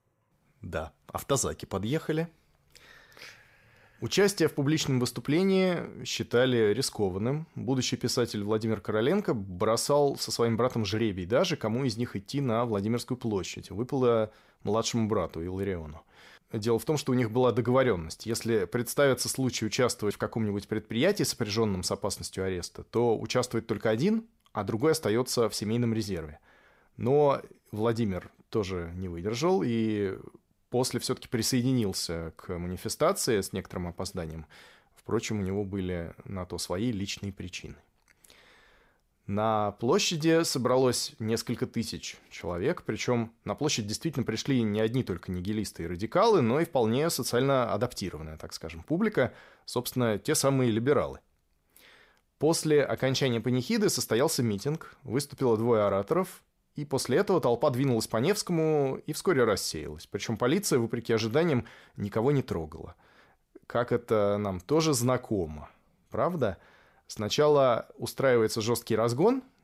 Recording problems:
none

